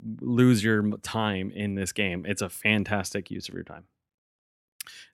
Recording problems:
none

